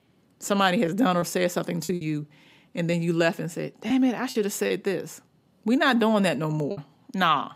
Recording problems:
choppy; very; 6% of the speech affected

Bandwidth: 15.5 kHz